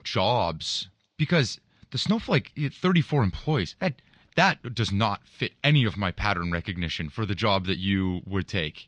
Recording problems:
garbled, watery; slightly
muffled; very slightly; fading above 4.5 kHz

